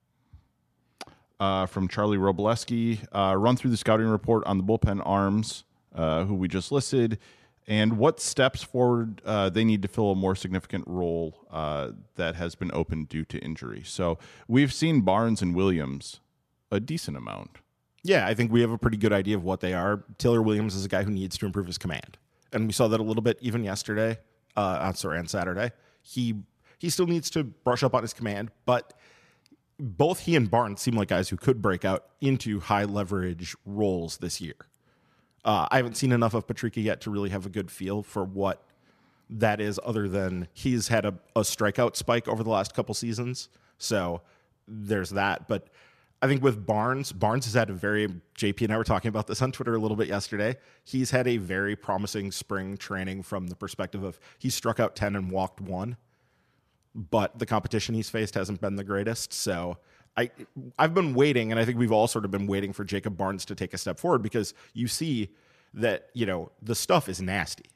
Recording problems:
none

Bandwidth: 14.5 kHz